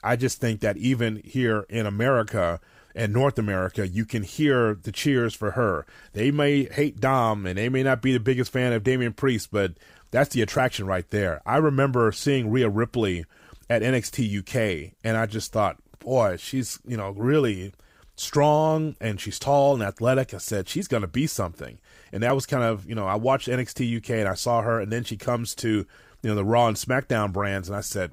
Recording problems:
none

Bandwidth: 15.5 kHz